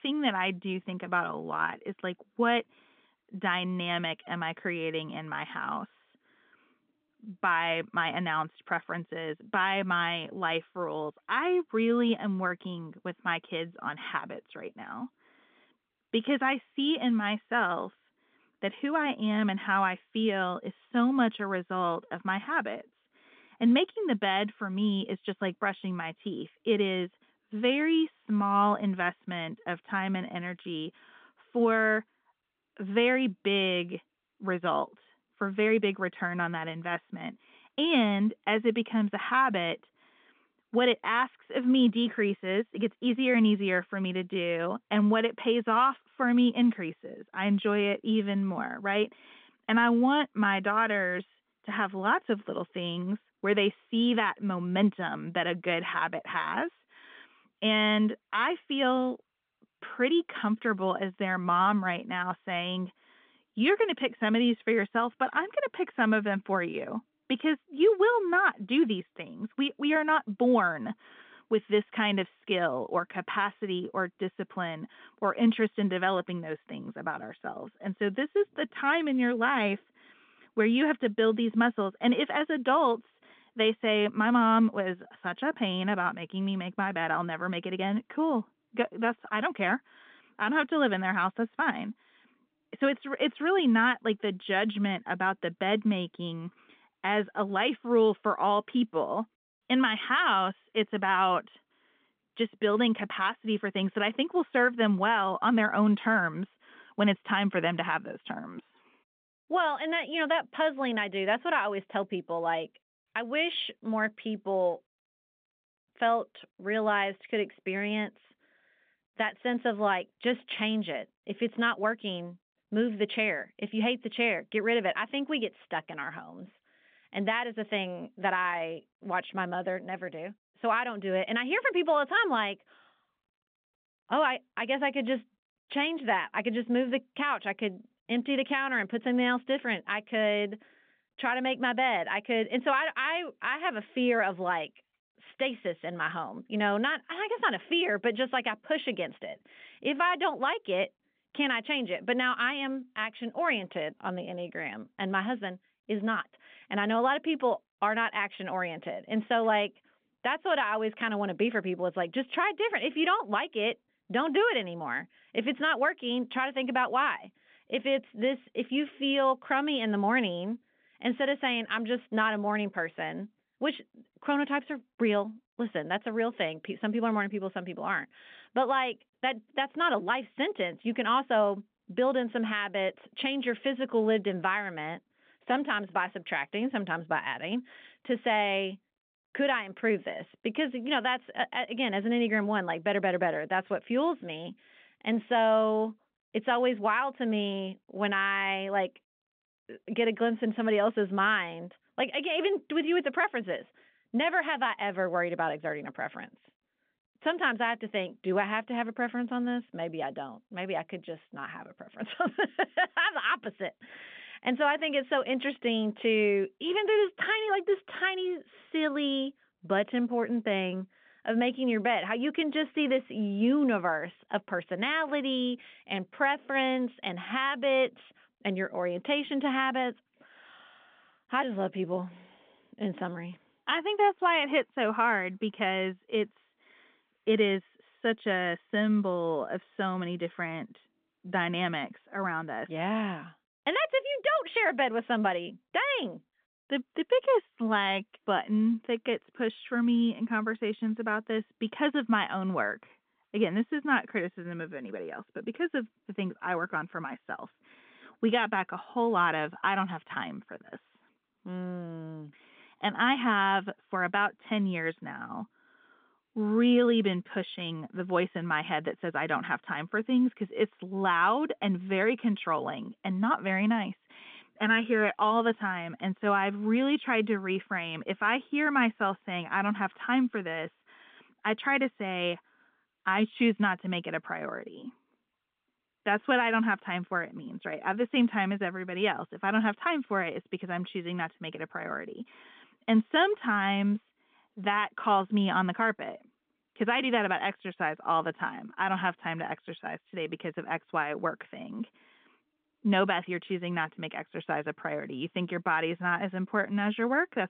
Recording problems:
phone-call audio; nothing above 3.5 kHz

